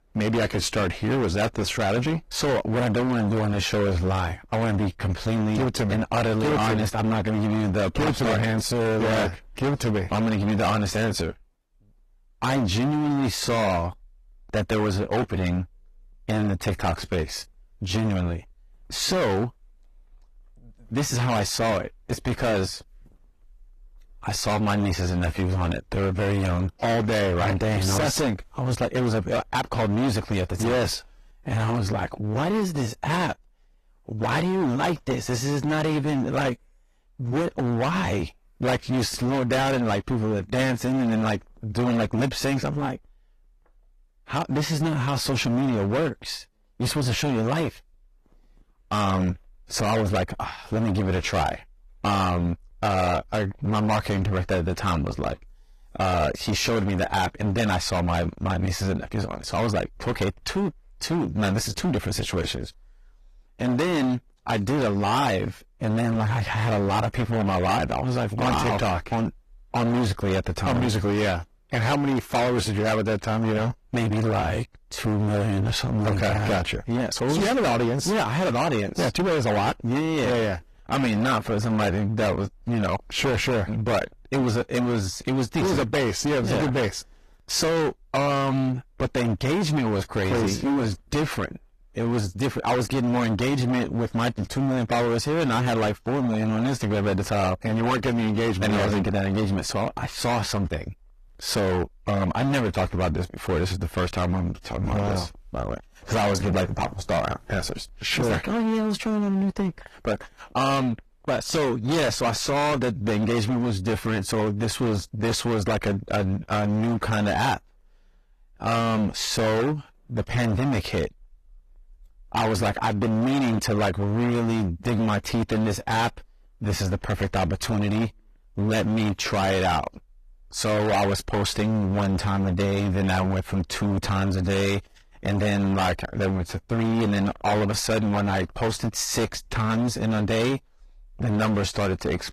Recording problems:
distortion; heavy; 24% of the sound clipped
garbled, watery; slightly; nothing above 14.5 kHz

